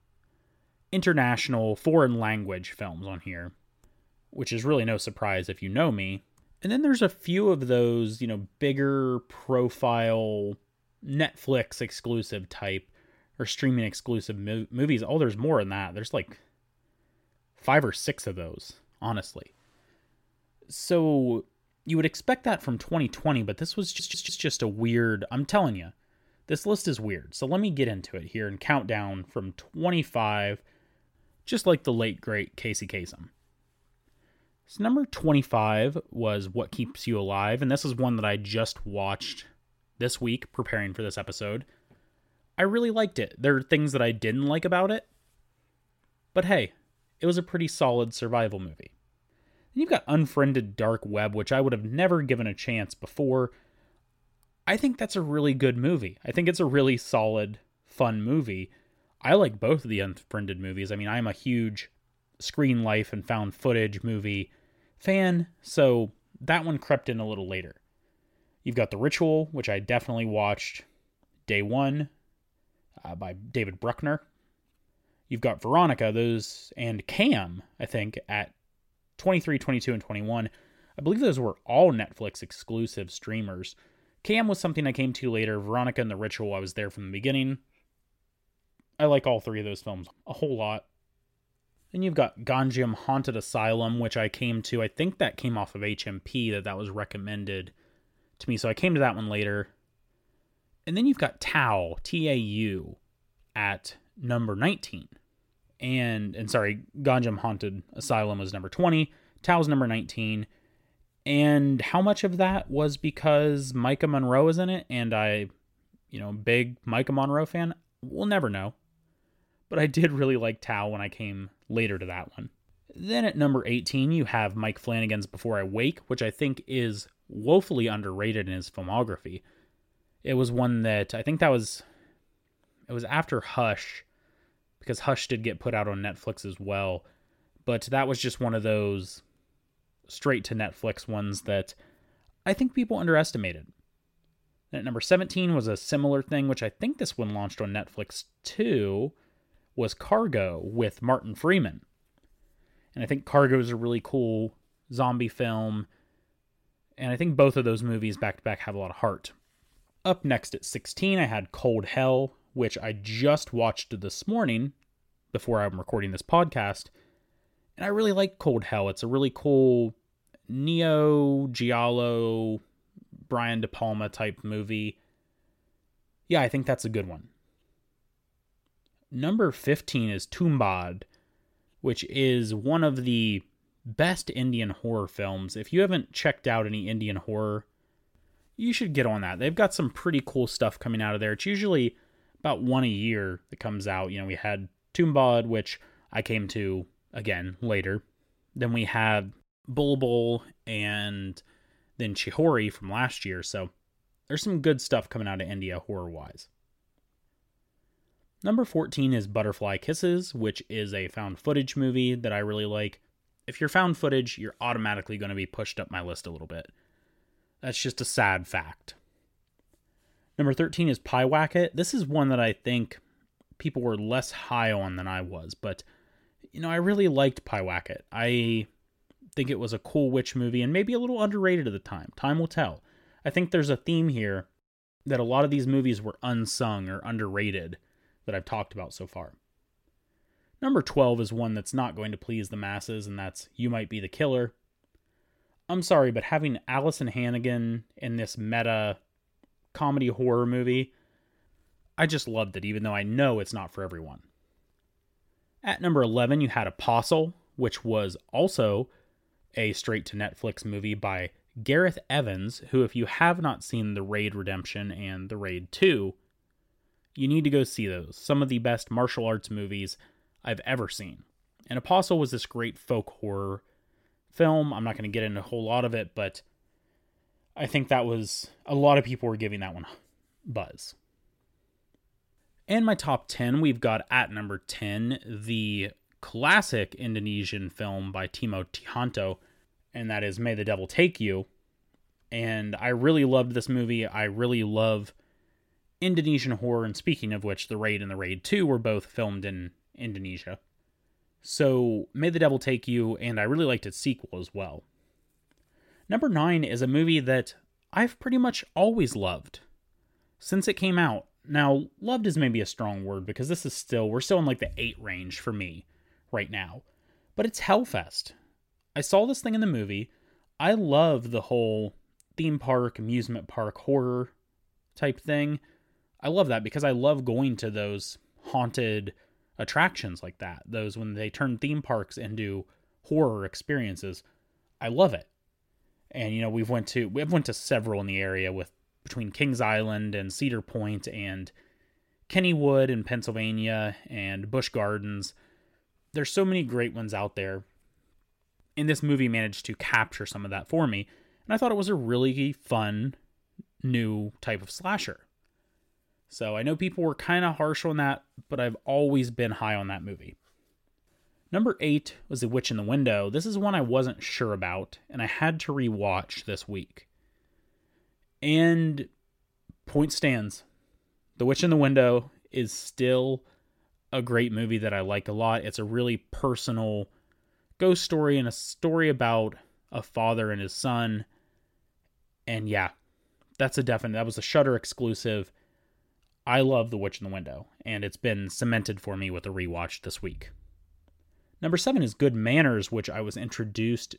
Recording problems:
audio stuttering; at 24 s

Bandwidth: 16.5 kHz